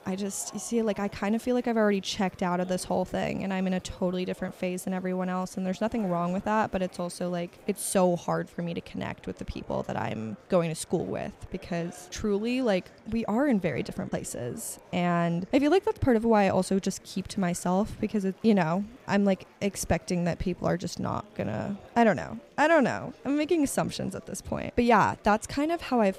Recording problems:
murmuring crowd; faint; throughout; 25 dB below the speech

